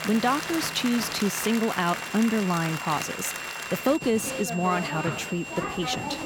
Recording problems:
crowd noise; loud; throughout; 6 dB below the speech
high-pitched whine; noticeable; throughout; 3 kHz, 10 dB below the speech
background music; faint; throughout; 25 dB below the speech

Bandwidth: 17.5 kHz